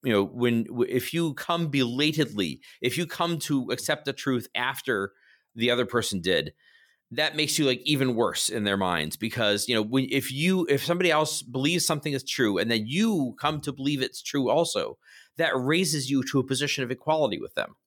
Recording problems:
none

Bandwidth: 18 kHz